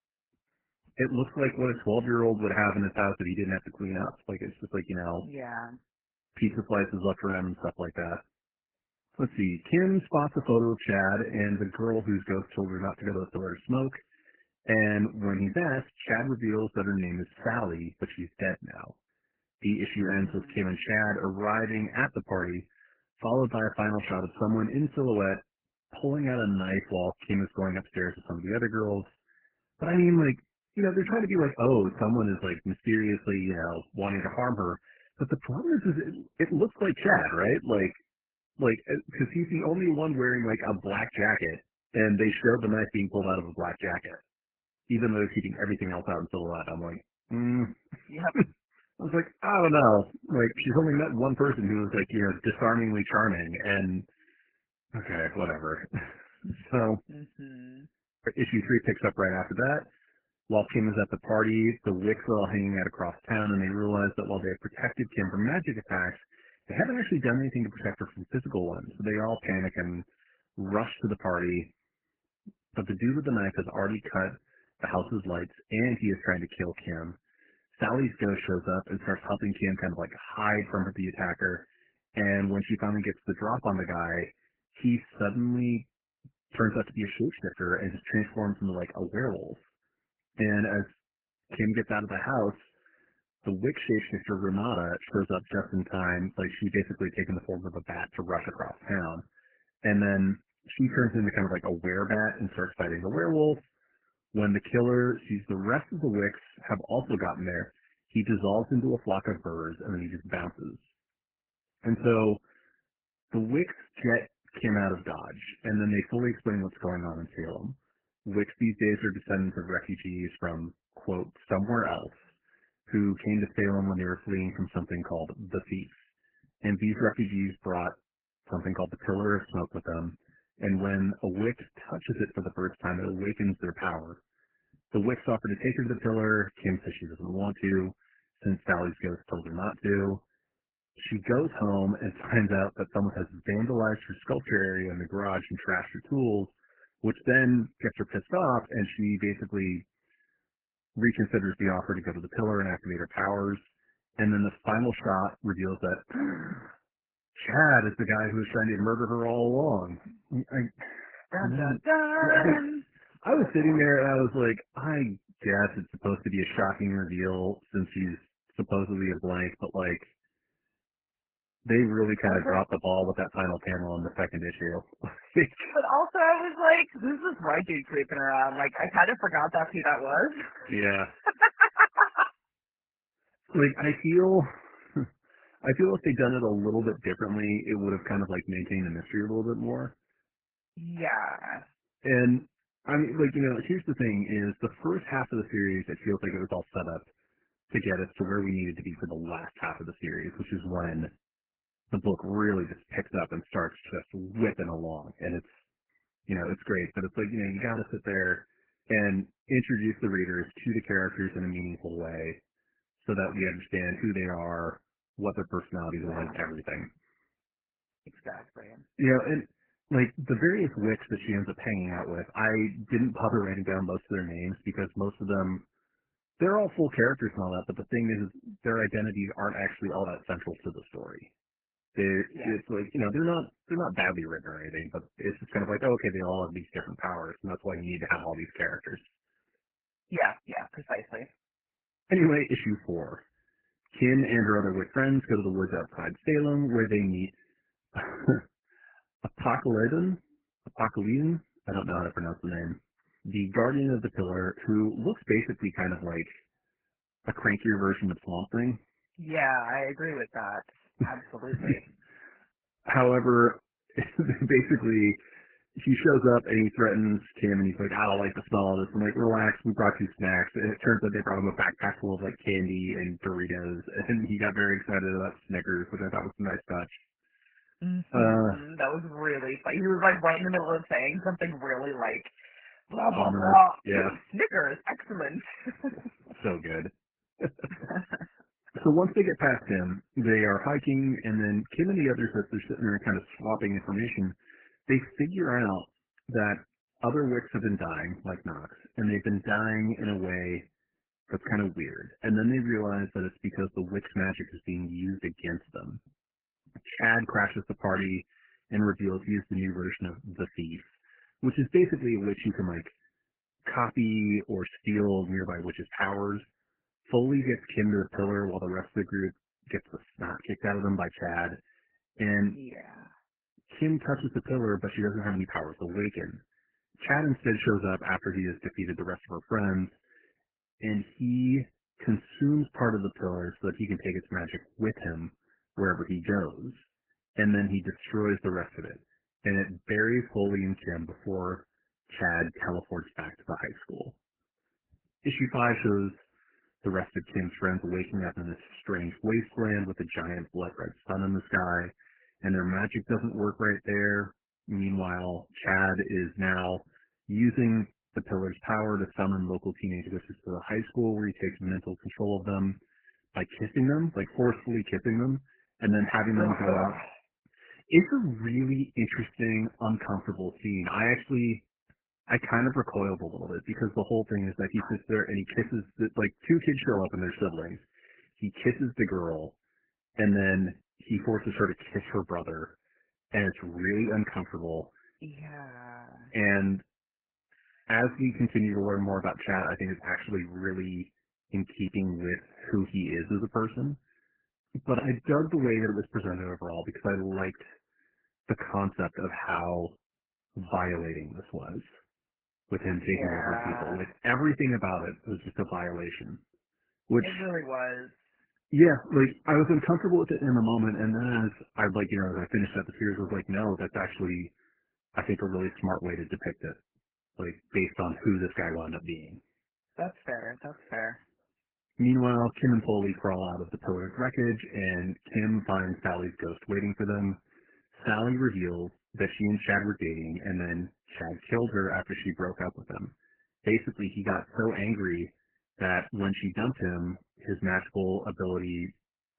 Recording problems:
garbled, watery; badly; nothing above 3 kHz

